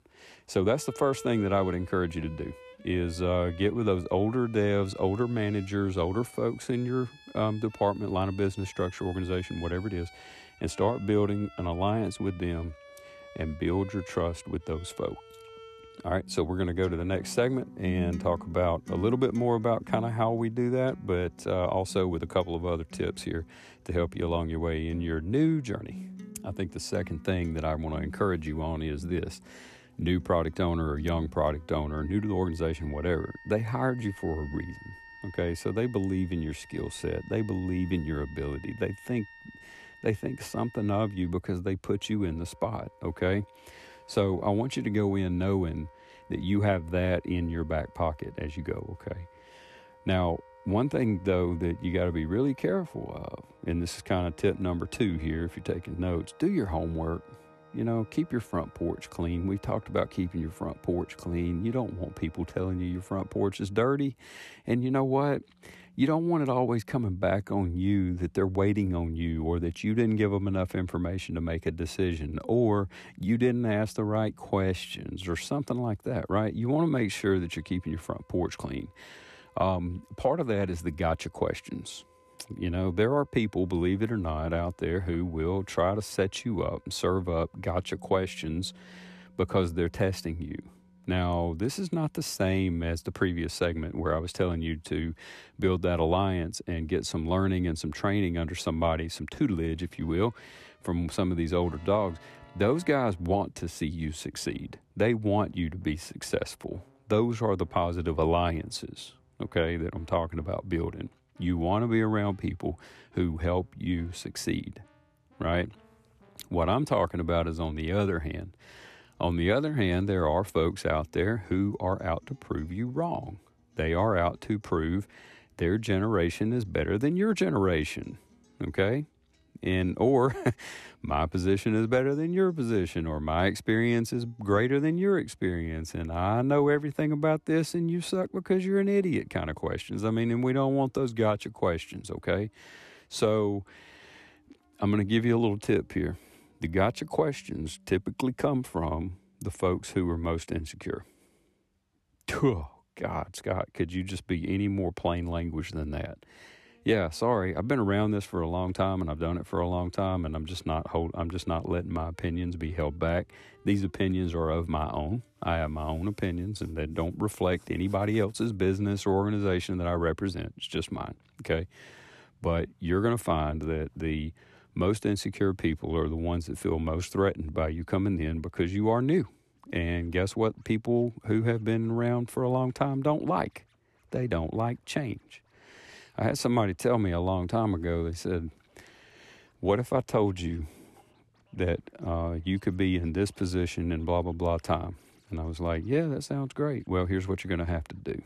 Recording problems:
background music; faint; throughout; 20 dB below the speech

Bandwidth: 13.5 kHz